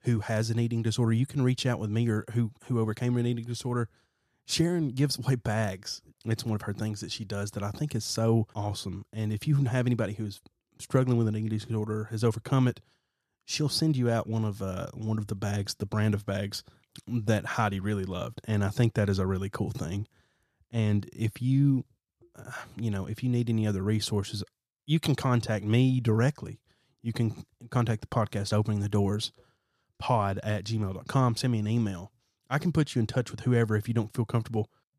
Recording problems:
none

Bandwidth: 14.5 kHz